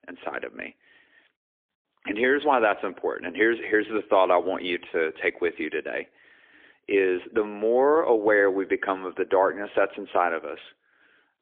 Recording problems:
phone-call audio; poor line; nothing above 3.5 kHz

